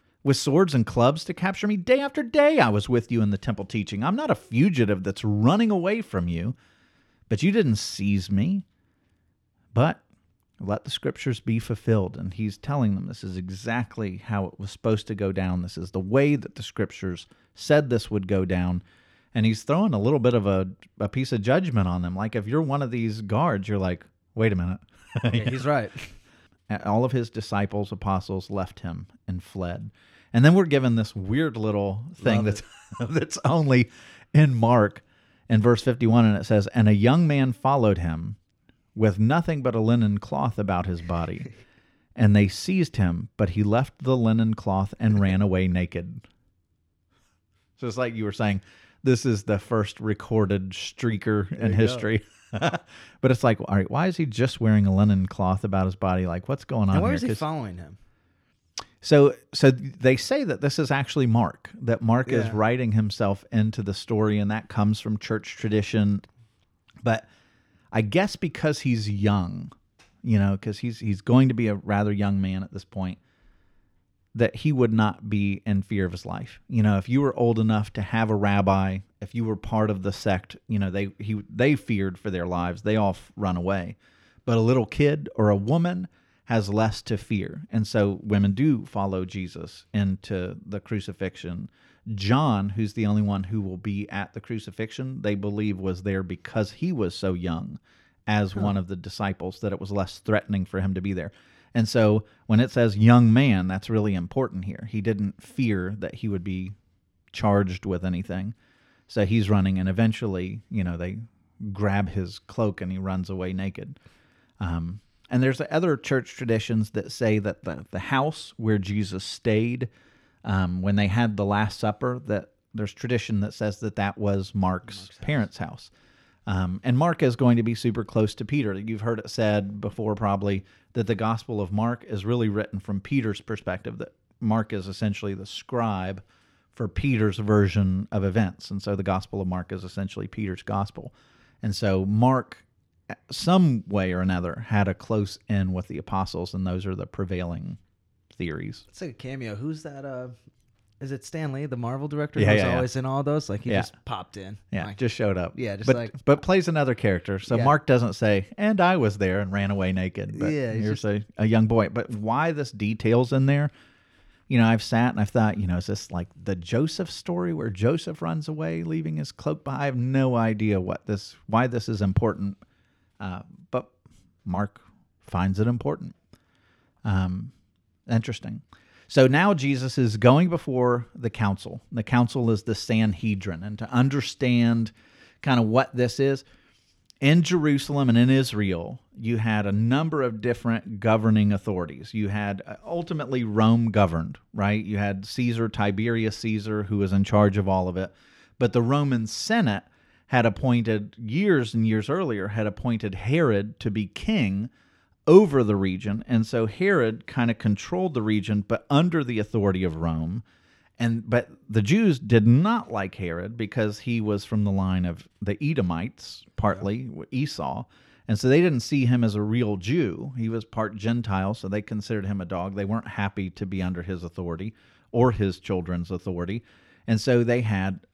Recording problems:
none

